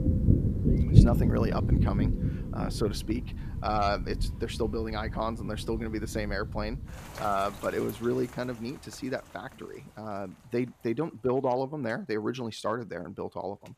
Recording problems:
rain or running water; very loud; throughout; 3 dB above the speech

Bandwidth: 14.5 kHz